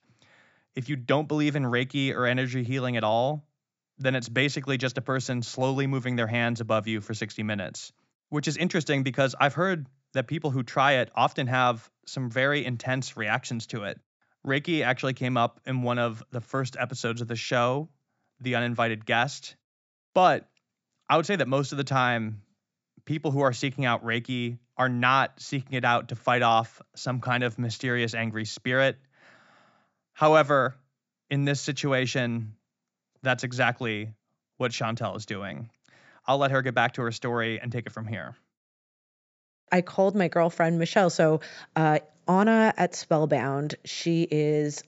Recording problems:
high frequencies cut off; noticeable; nothing above 8 kHz

